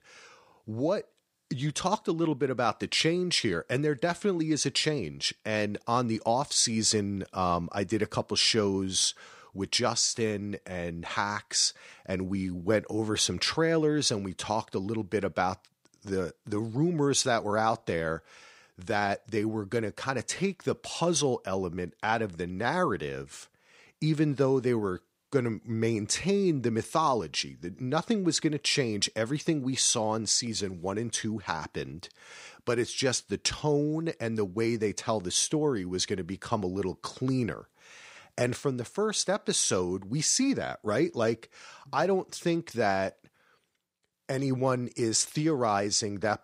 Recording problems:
none

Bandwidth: 15.5 kHz